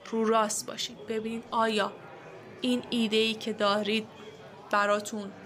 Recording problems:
murmuring crowd; noticeable; throughout; 20 dB below the speech

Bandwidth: 15.5 kHz